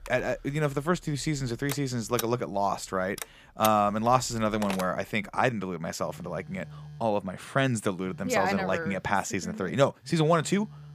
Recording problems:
alarms or sirens; noticeable; throughout; 15 dB below the speech

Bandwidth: 15 kHz